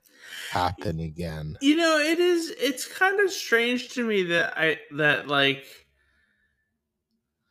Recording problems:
wrong speed, natural pitch; too slow; 0.6 times normal speed

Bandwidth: 15 kHz